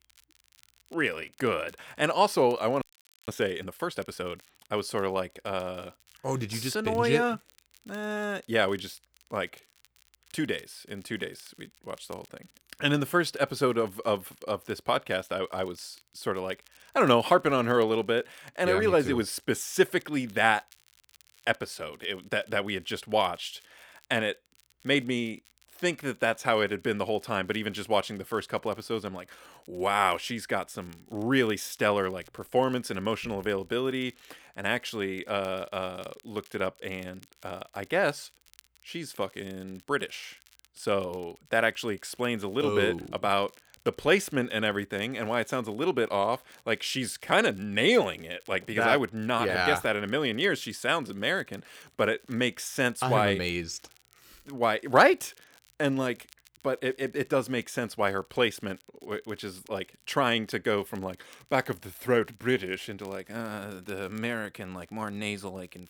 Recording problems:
crackle, like an old record; faint; 30 dB below the speech
audio freezing; at 3 s

